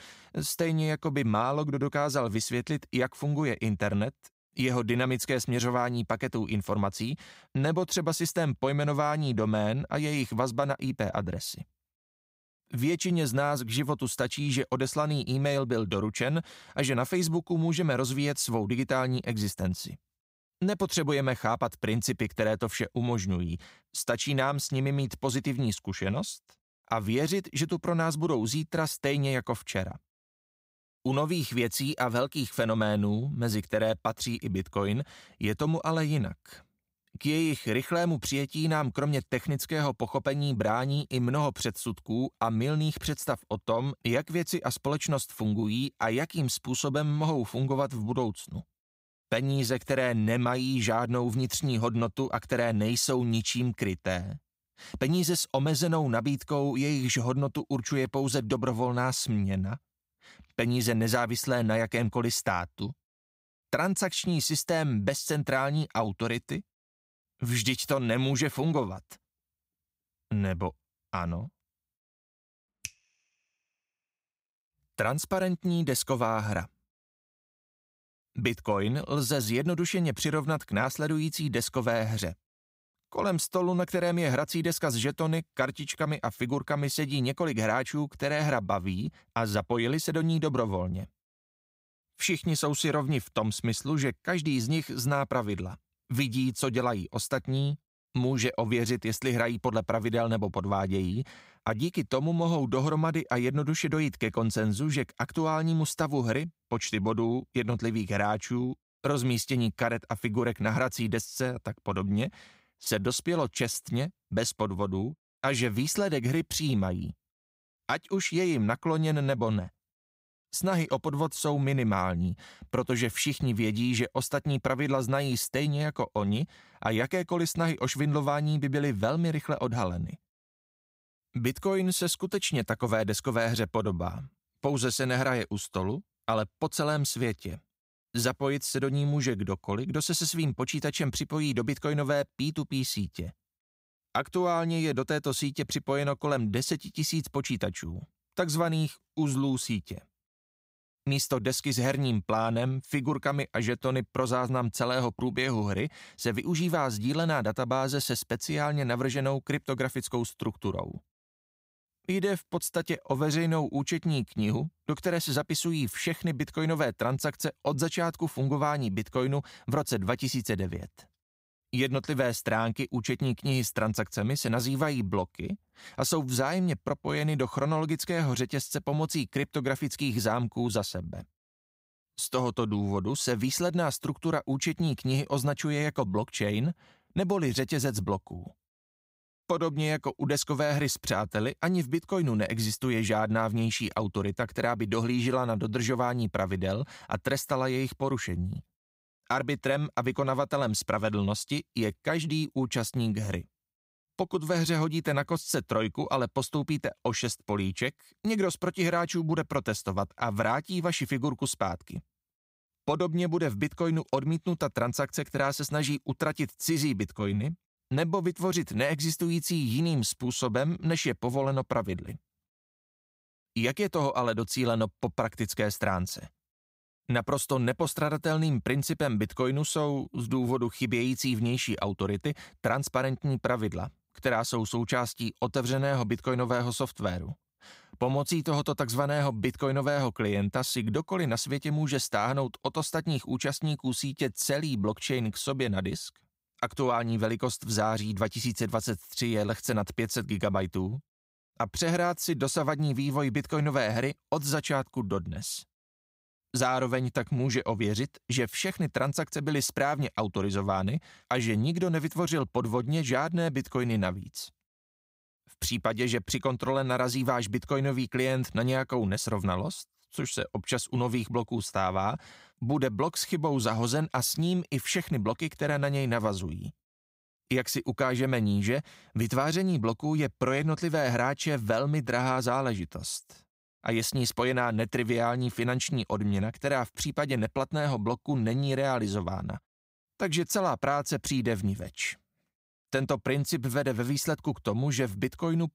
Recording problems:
none

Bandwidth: 15.5 kHz